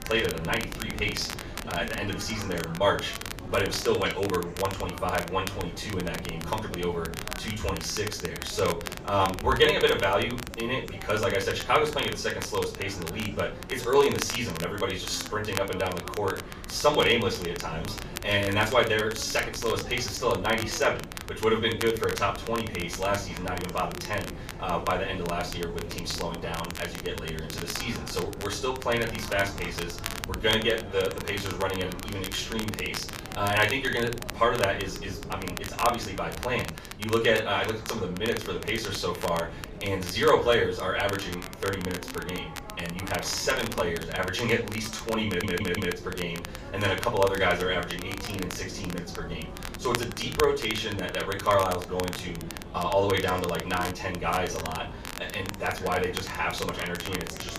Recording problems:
off-mic speech; far
room echo; slight; dies away in 0.3 s
chatter from many people; noticeable; throughout; 20 dB below the speech
wind noise on the microphone; occasional gusts; 20 dB below the speech
crackle, like an old record; noticeable; 10 dB below the speech
audio stuttering; at 45 s

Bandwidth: 14.5 kHz